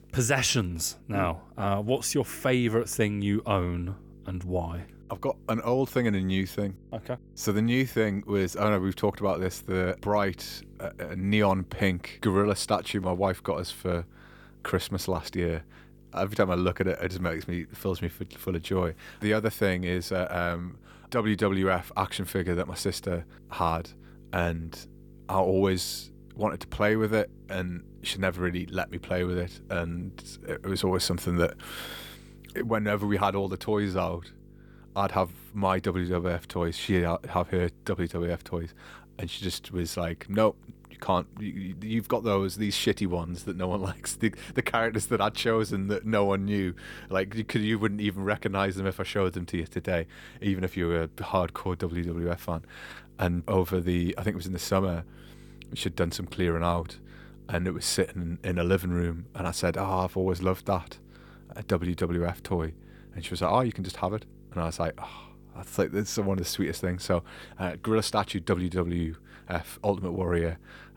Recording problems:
electrical hum; faint; throughout; 50 Hz, 30 dB below the speech

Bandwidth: 18.5 kHz